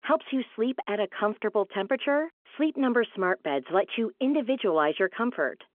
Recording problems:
phone-call audio; nothing above 3.5 kHz

